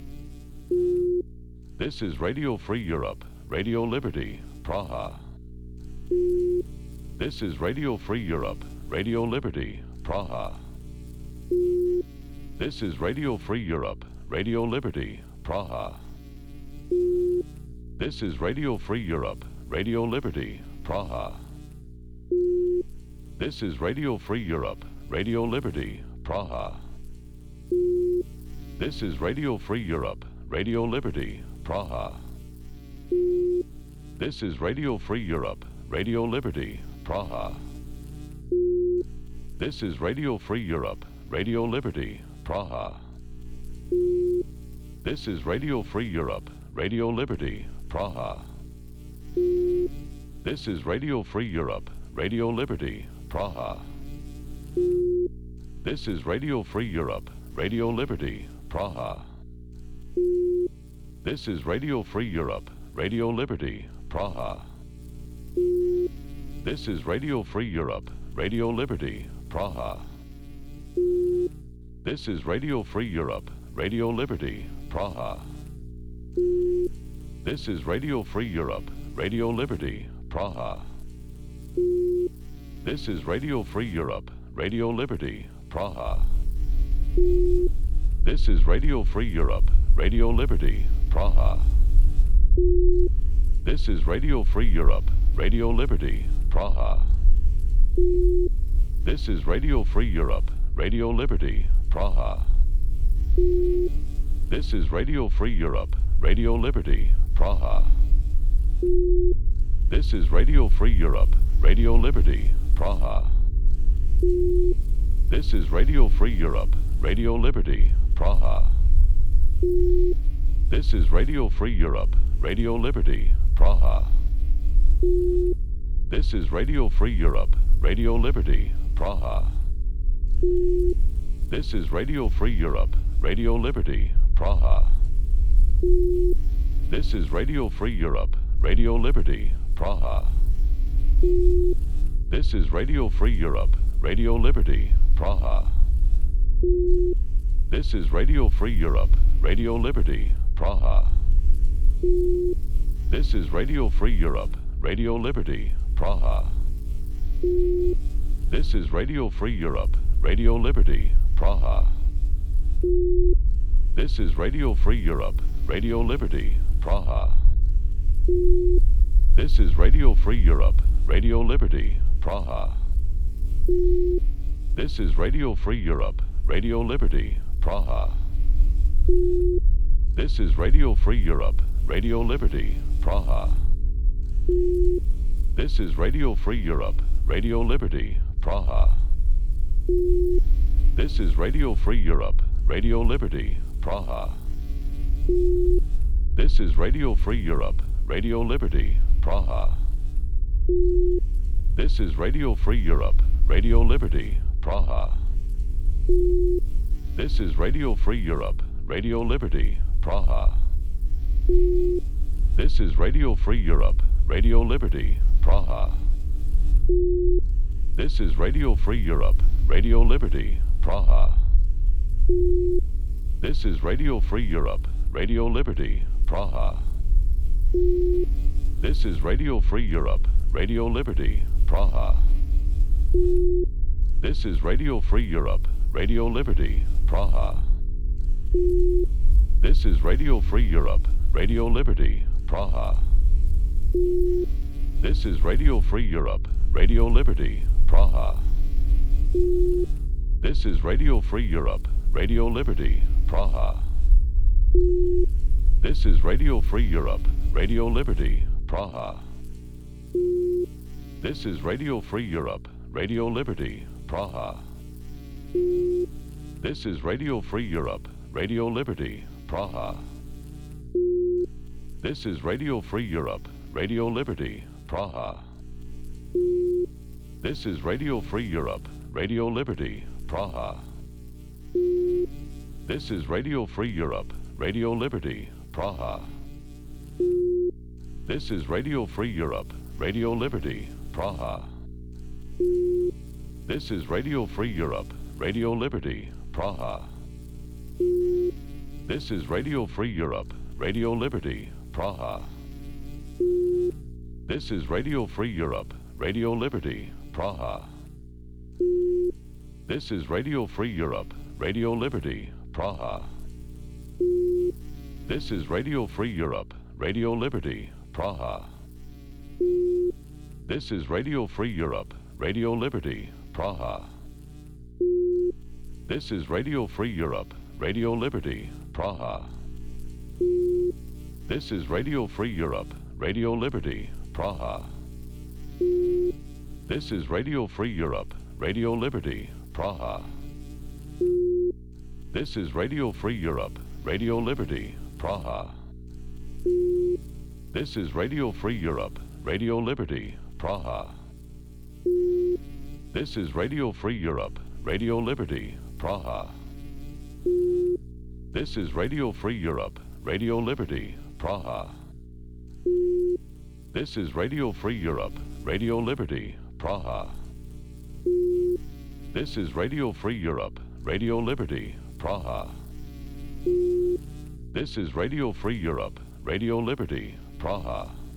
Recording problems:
low rumble; noticeable; from 1:26 to 4:19; 20 dB below the speech
electrical hum; faint; throughout; 60 Hz, 20 dB below the speech

